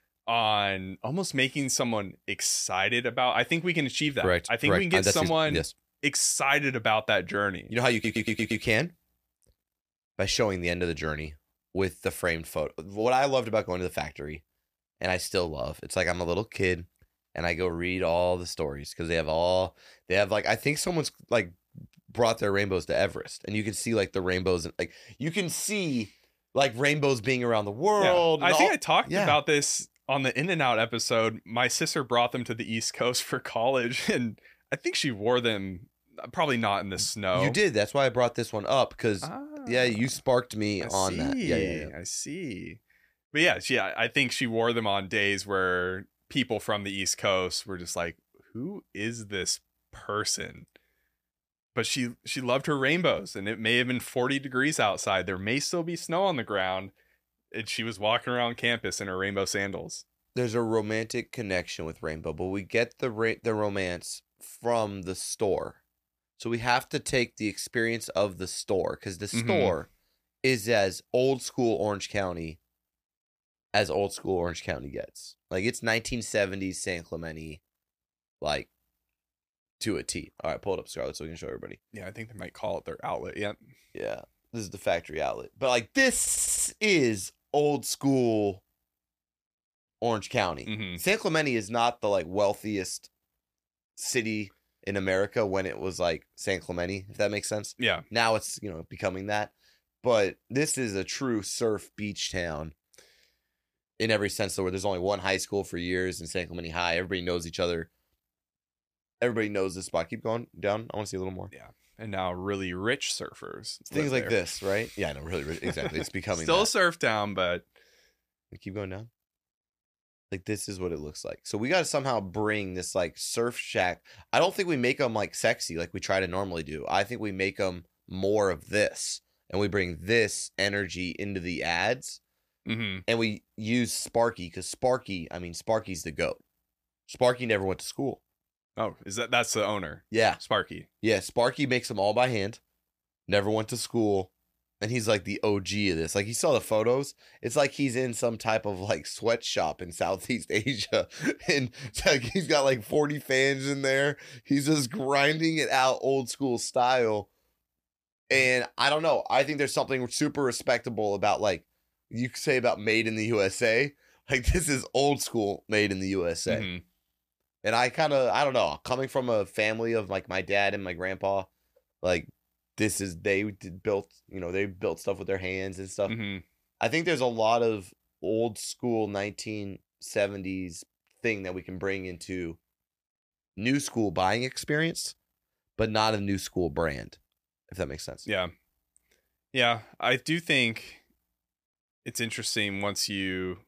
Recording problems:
audio stuttering; at 8 s and at 1:26

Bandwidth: 15 kHz